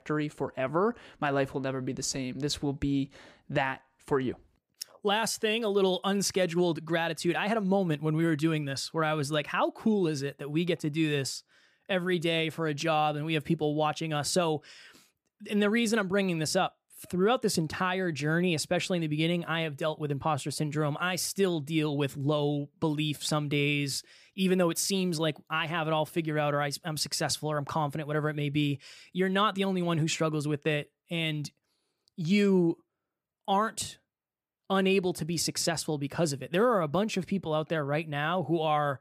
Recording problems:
none

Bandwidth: 15 kHz